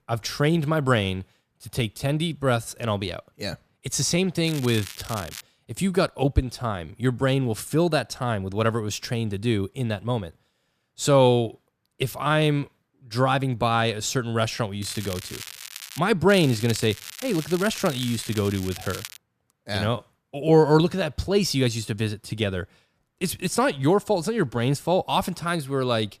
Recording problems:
crackling; noticeable; at 4.5 s, from 15 to 16 s and from 16 to 19 s; 15 dB below the speech

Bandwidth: 14.5 kHz